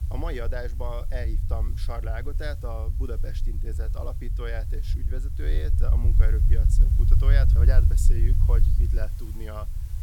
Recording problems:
low rumble; loud; throughout; 6 dB below the speech
hiss; noticeable; throughout; 15 dB below the speech
animal sounds; very faint; throughout; 25 dB below the speech

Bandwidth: 17 kHz